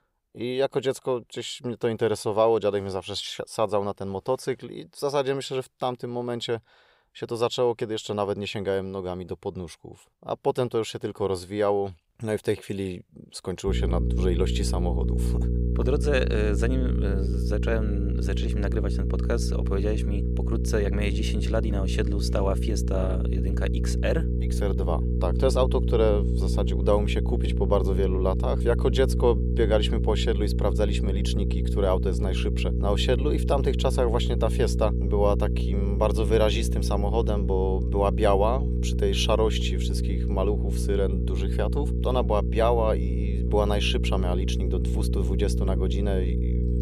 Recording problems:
electrical hum; loud; from 14 s on; 60 Hz, 9 dB below the speech

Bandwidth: 15.5 kHz